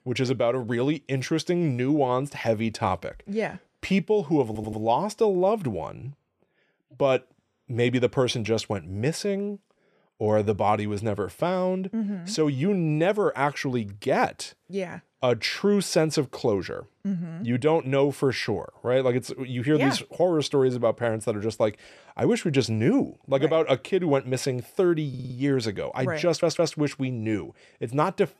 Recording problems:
audio stuttering; at 4.5 s, at 25 s and at 26 s

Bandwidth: 14.5 kHz